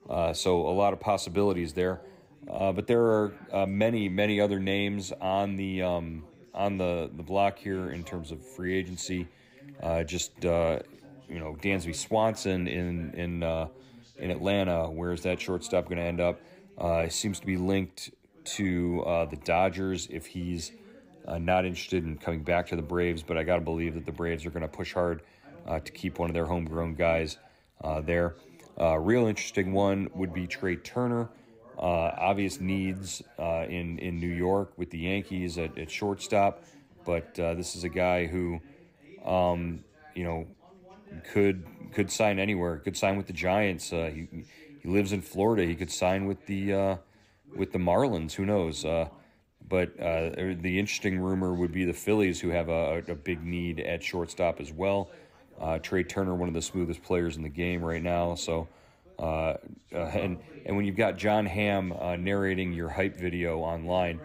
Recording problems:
background chatter; faint; throughout; 3 voices, 25 dB below the speech

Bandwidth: 15.5 kHz